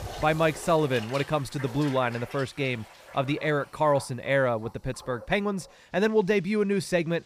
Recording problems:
household noises; noticeable; throughout; 15 dB below the speech

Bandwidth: 15 kHz